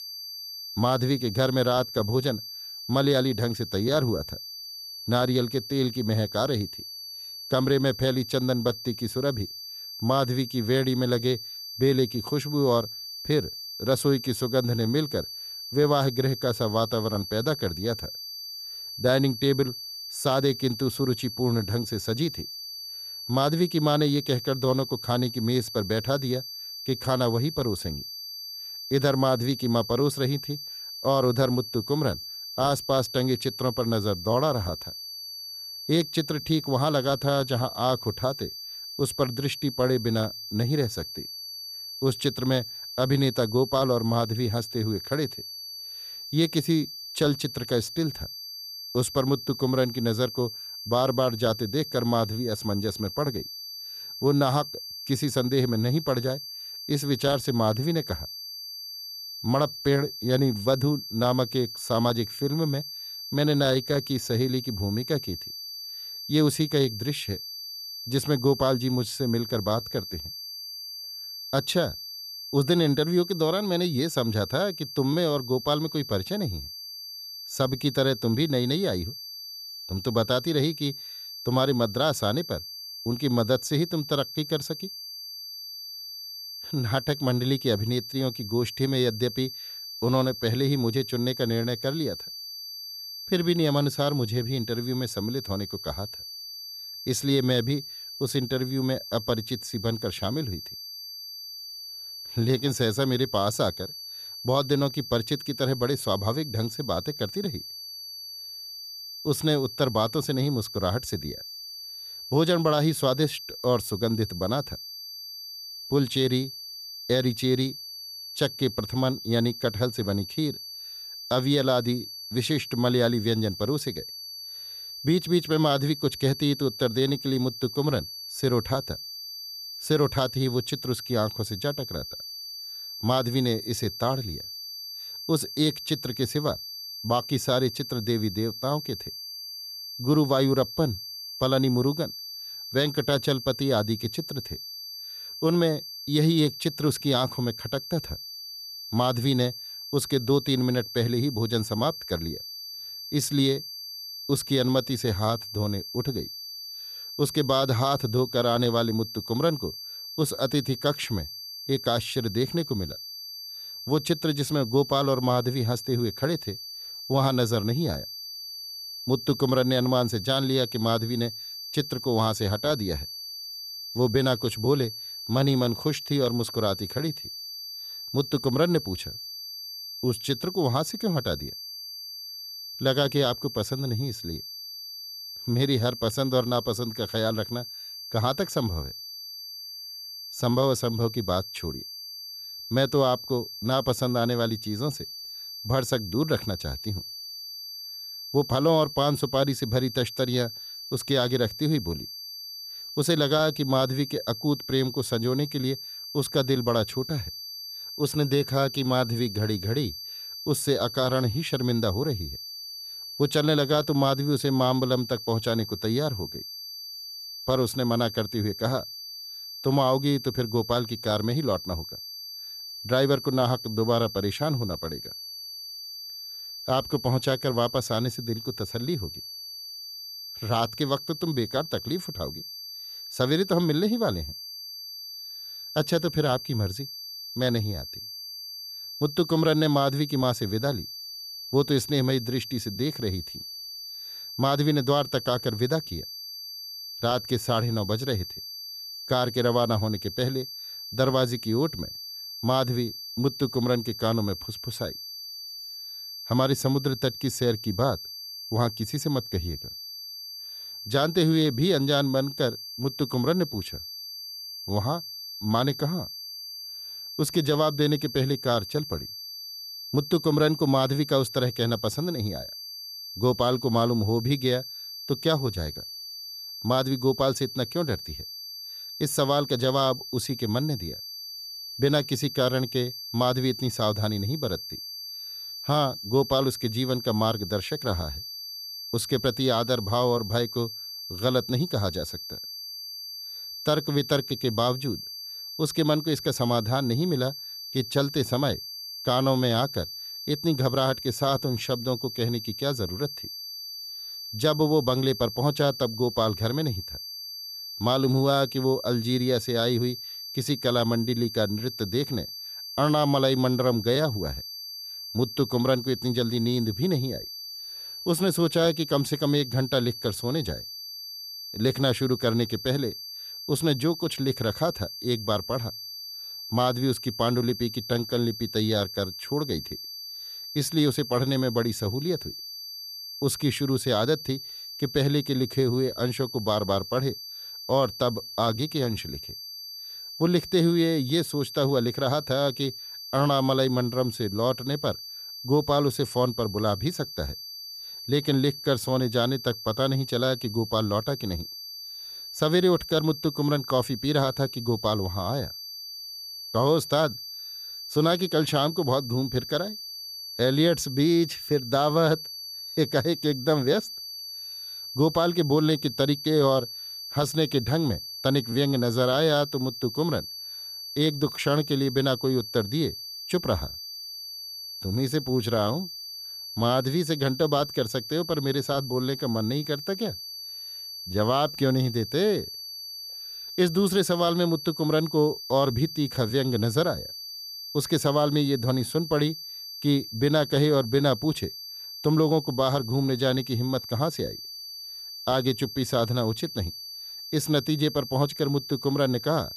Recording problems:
high-pitched whine; loud; throughout; 4.5 kHz, 9 dB below the speech

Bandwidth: 14.5 kHz